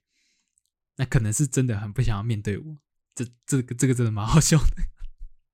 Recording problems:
none

